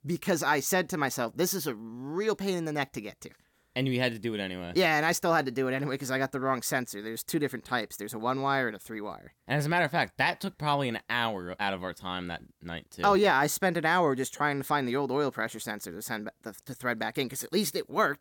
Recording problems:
none

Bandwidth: 17 kHz